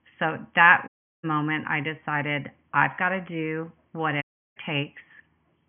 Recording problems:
high frequencies cut off; severe; nothing above 3.5 kHz
audio cutting out; at 1 s and at 4 s

